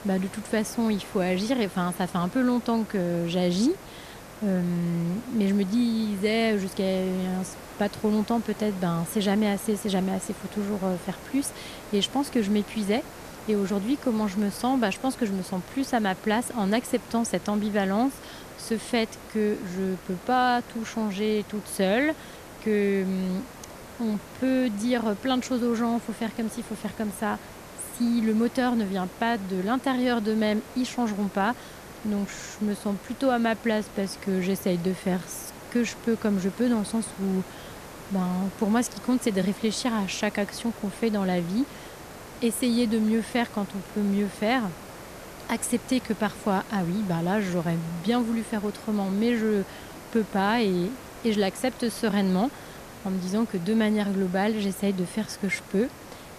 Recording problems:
hiss; noticeable; throughout; 15 dB below the speech

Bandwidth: 14.5 kHz